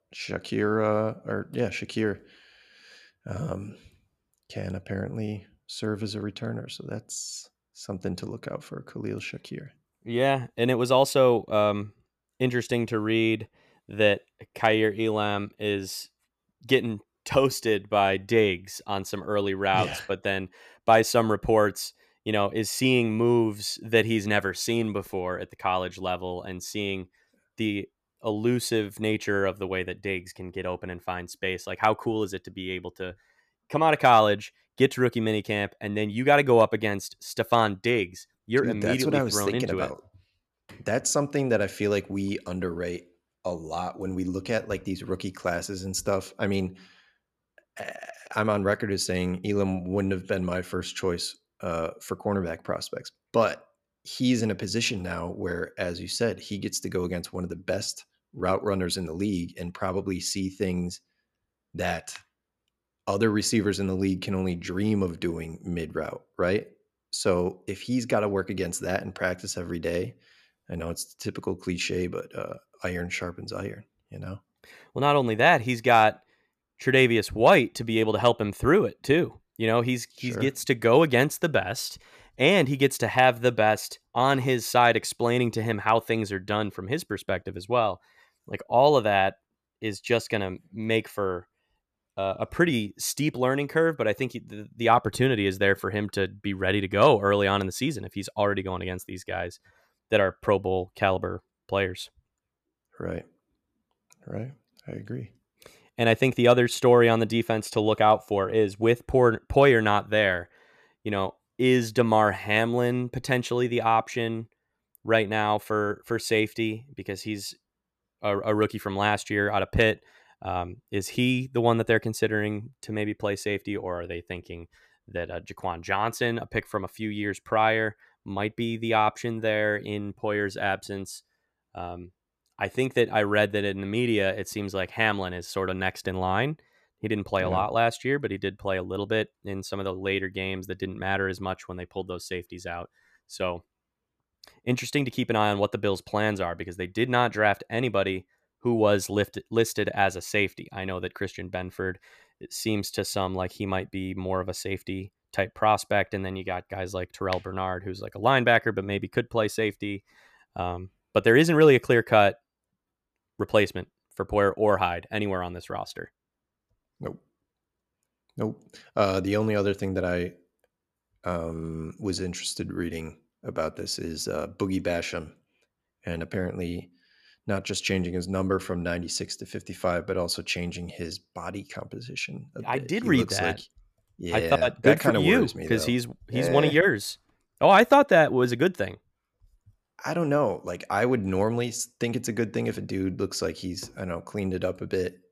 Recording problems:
none

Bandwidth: 14.5 kHz